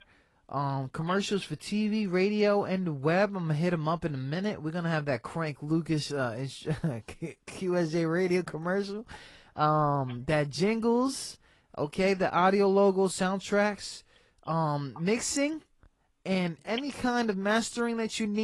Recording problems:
garbled, watery; slightly; nothing above 11 kHz
abrupt cut into speech; at the end

